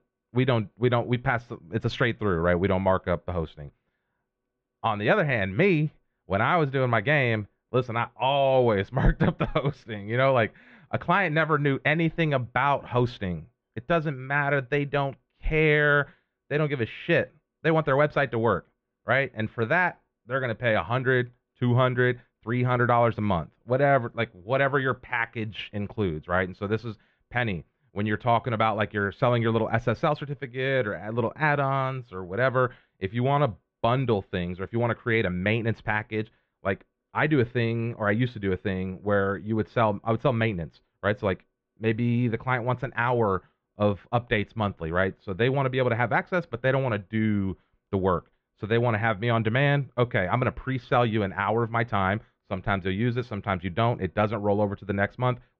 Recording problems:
muffled; very; fading above 3 kHz

